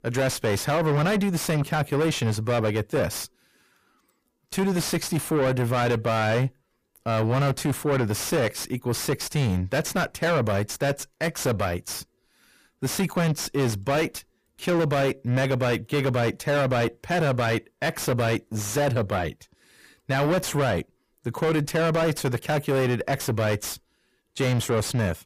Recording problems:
distortion; heavy; 6 dB below the speech

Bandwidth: 15 kHz